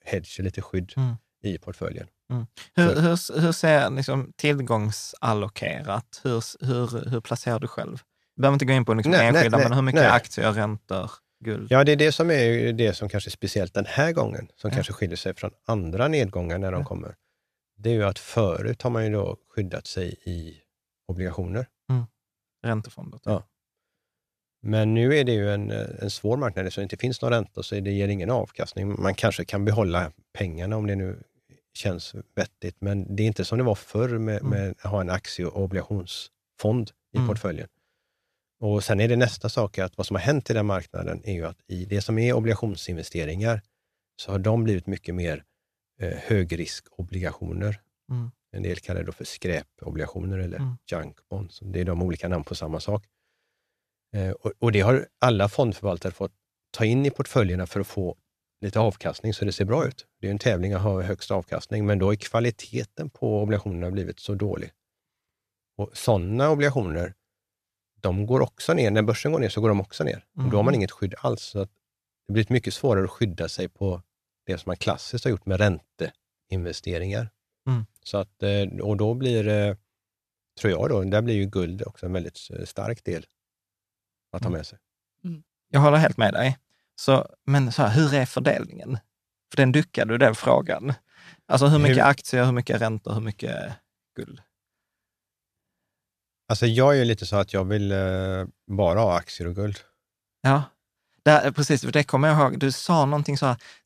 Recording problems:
none

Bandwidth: 14 kHz